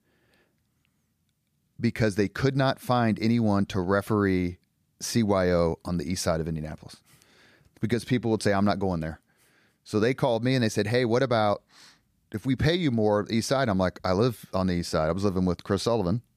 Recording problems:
none

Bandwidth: 15 kHz